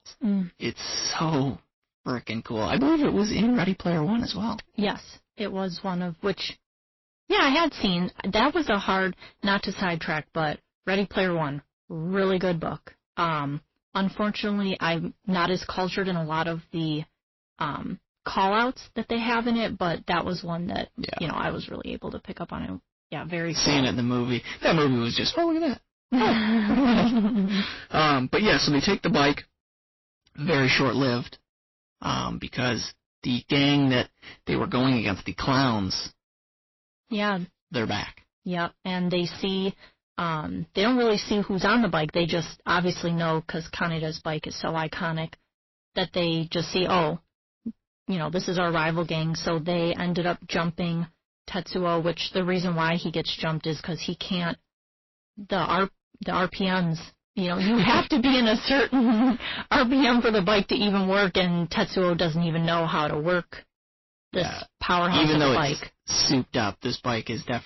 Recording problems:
distortion; heavy; 12% of the sound clipped
garbled, watery; slightly; nothing above 5.5 kHz

